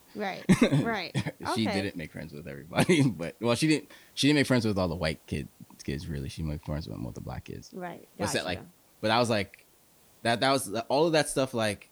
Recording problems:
hiss; faint; throughout; 30 dB below the speech

